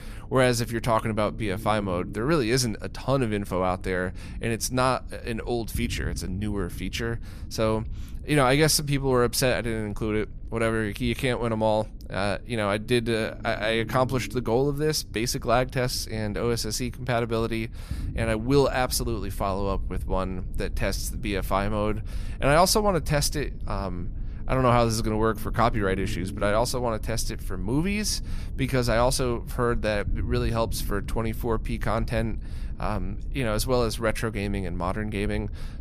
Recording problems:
low rumble; faint; throughout; 25 dB below the speech

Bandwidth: 14.5 kHz